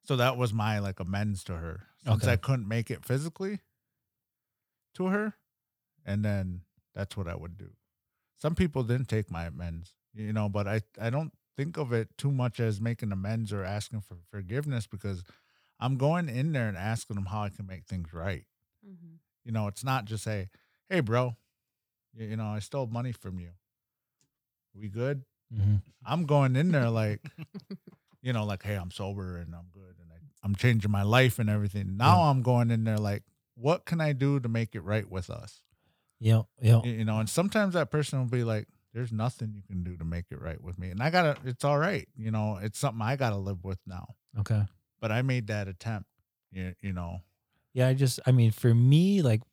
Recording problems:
none

